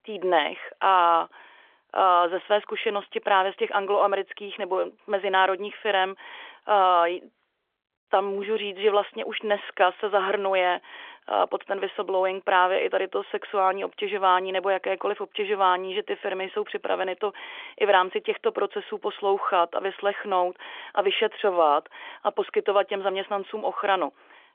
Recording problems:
phone-call audio; nothing above 3.5 kHz

